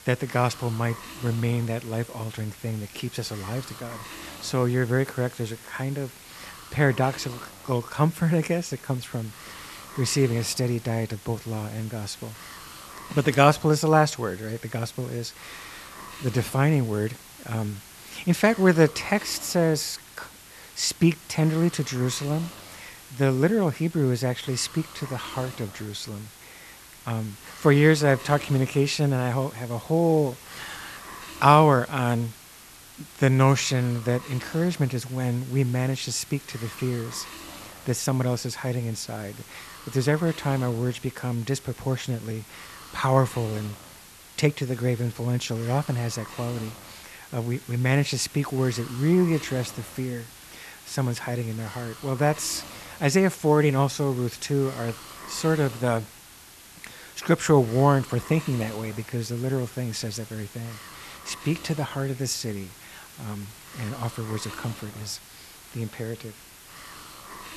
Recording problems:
hiss; noticeable; throughout; 15 dB below the speech

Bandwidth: 13.5 kHz